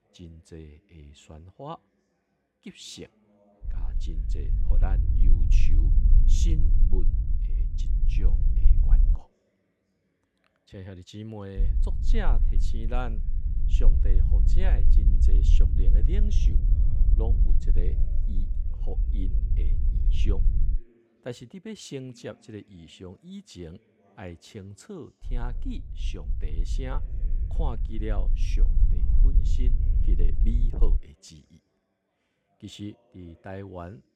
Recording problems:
low rumble; loud; from 3.5 to 9 s, from 12 to 21 s and from 25 to 31 s; 5 dB below the speech
background chatter; faint; throughout; 3 voices, 25 dB below the speech

